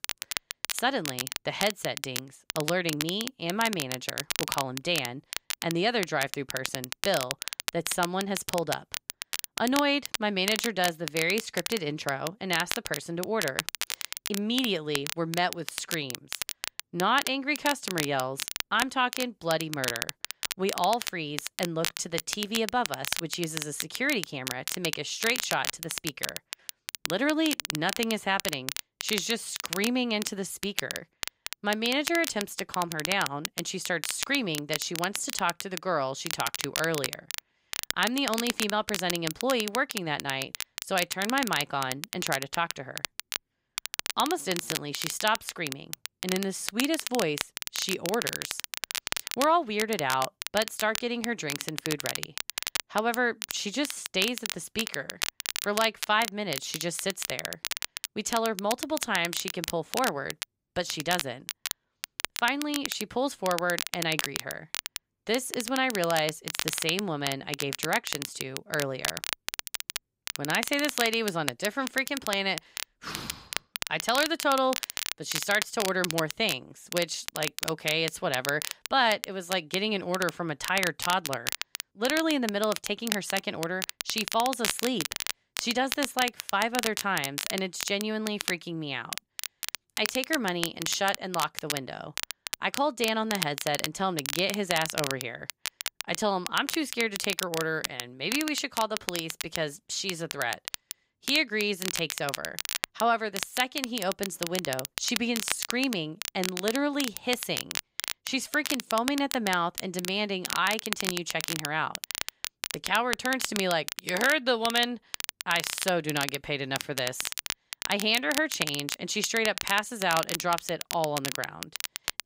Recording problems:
crackle, like an old record; loud; 5 dB below the speech

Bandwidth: 15.5 kHz